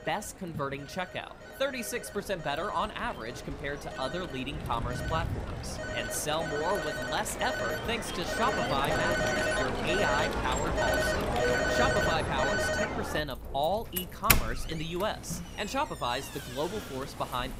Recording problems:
alarms or sirens; very loud; throughout; 3 dB above the speech
rain or running water; noticeable; throughout; 10 dB below the speech

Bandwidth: 15.5 kHz